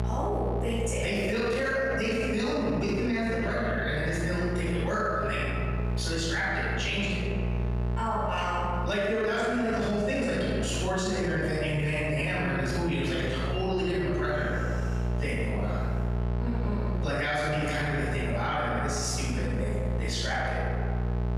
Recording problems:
room echo; strong; dies away in 1.5 s
off-mic speech; far
squashed, flat; heavily
electrical hum; noticeable; throughout; 60 Hz, 15 dB below the speech

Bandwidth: 15 kHz